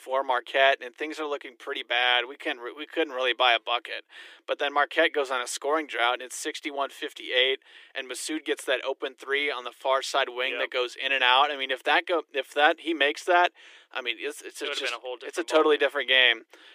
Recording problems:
thin; very; fading below 300 Hz

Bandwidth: 15 kHz